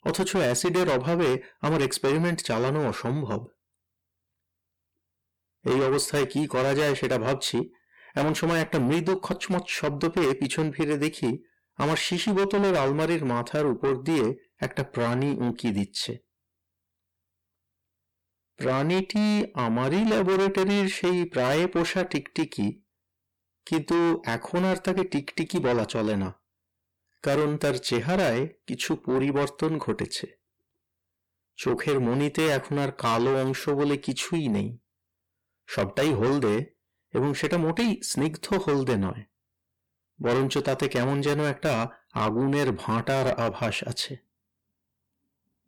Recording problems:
distortion; heavy; 6 dB below the speech

